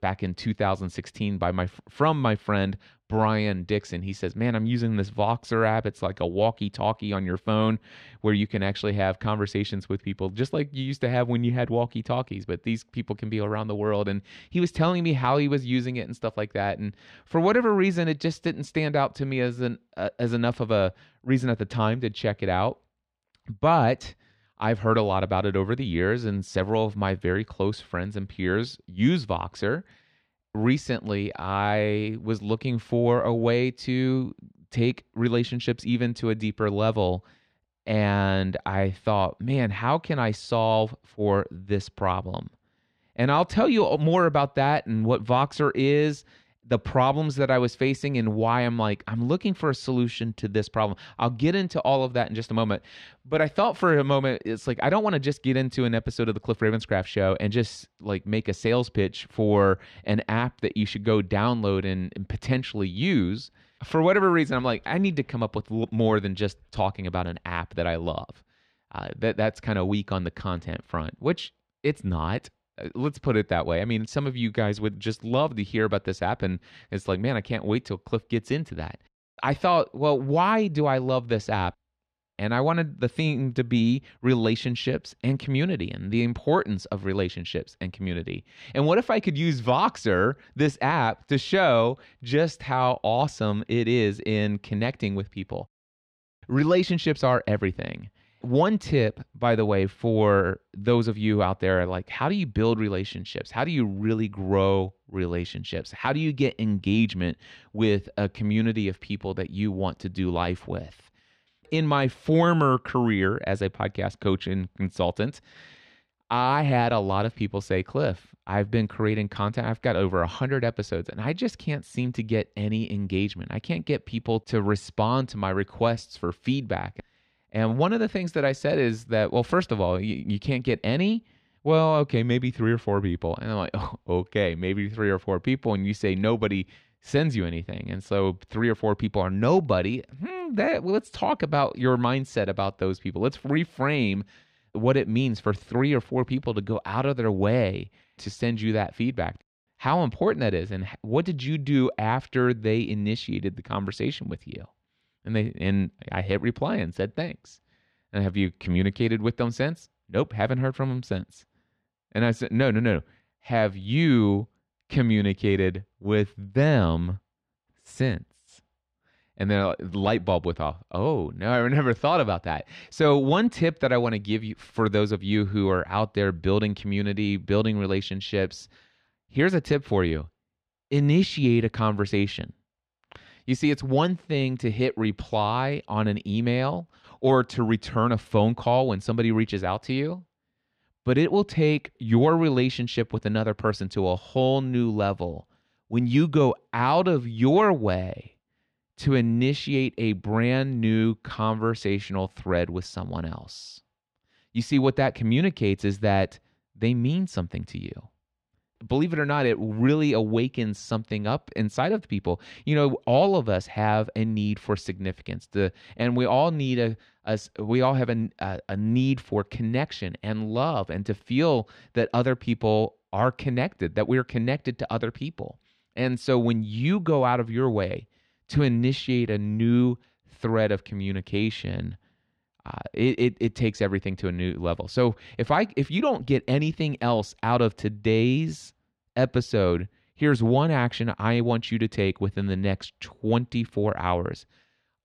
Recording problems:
muffled; slightly; fading above 3 kHz

